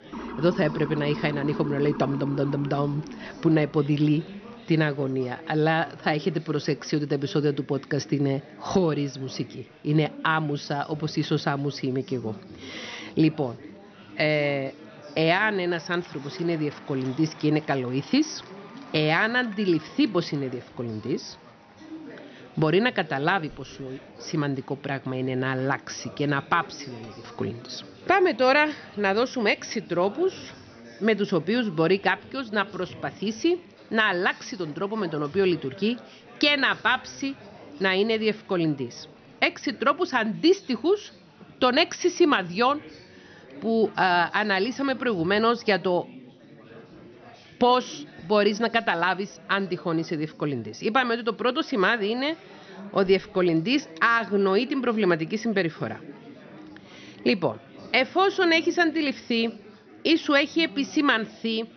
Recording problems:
high frequencies cut off; noticeable; nothing above 6 kHz
chatter from many people; faint; throughout; 20 dB below the speech
siren; noticeable; until 4 s; peak 9 dB below the speech

